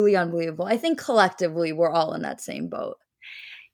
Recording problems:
abrupt cut into speech; at the start

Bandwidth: 18.5 kHz